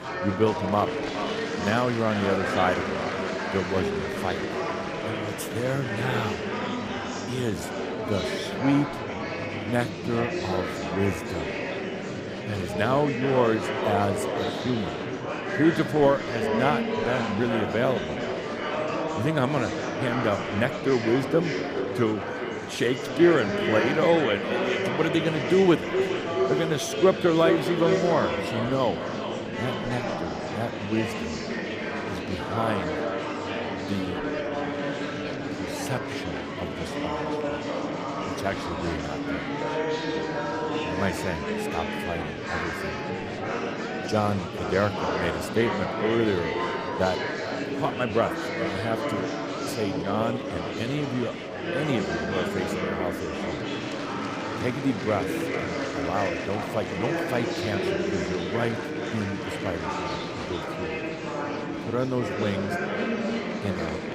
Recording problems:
echo of what is said; strong; throughout; 410 ms later, 7 dB below the speech
murmuring crowd; loud; throughout; 3 dB below the speech

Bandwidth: 15 kHz